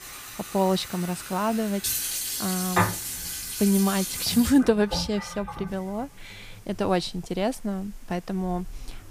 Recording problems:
household noises; loud; throughout; 4 dB below the speech
hiss; faint; until 3 s and from 5.5 s on; 25 dB below the speech

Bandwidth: 15 kHz